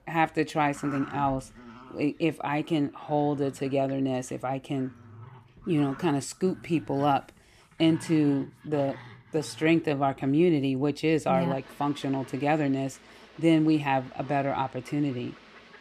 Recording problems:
animal sounds; faint; throughout; 20 dB below the speech

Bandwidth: 14.5 kHz